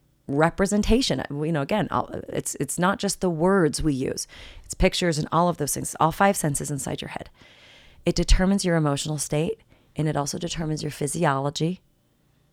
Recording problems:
none

